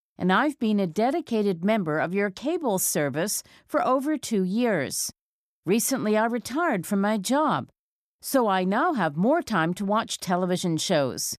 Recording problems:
none

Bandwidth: 14.5 kHz